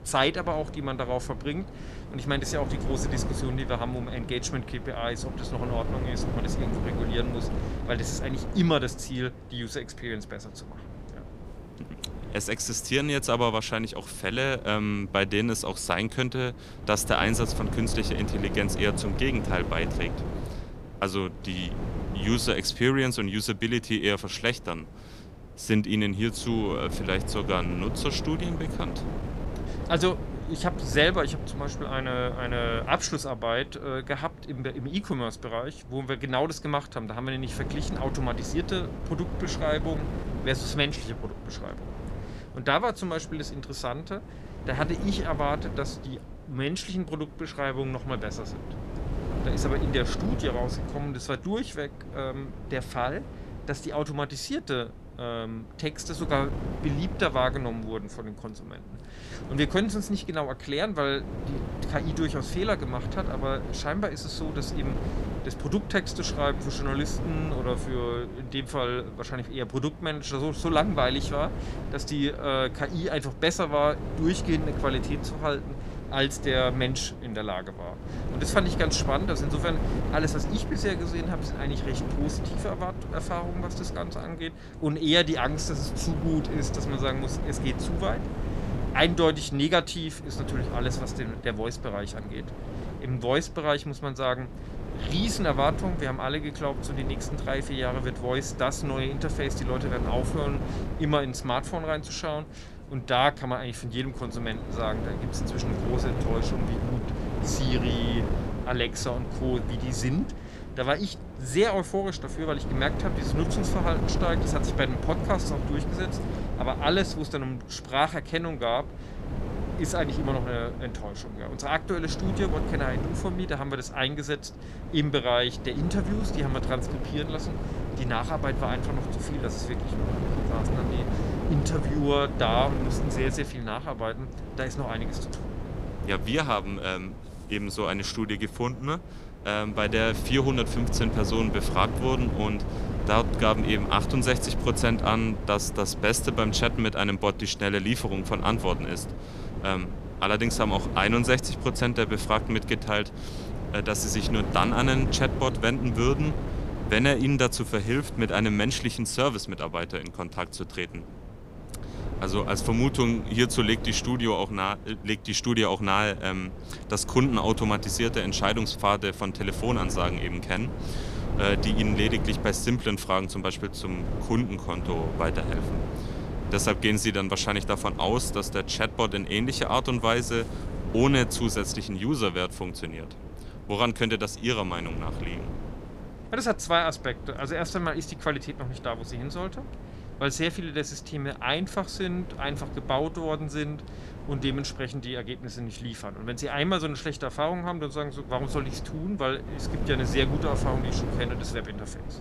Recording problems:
wind noise on the microphone; occasional gusts; 10 dB below the speech

